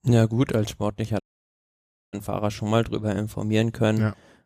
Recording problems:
audio cutting out; at 1 s for 1 s

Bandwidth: 14.5 kHz